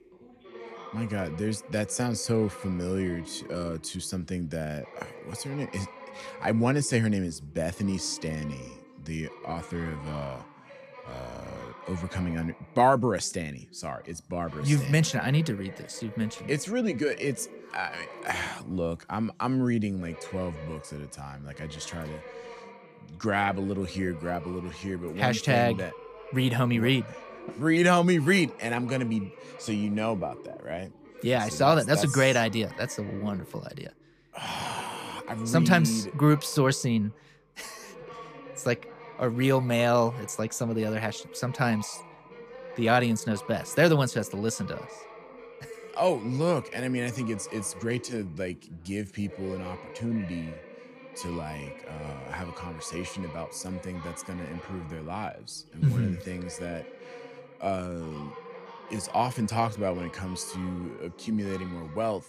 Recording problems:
background chatter; noticeable; throughout; 2 voices, 15 dB below the speech

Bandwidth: 14.5 kHz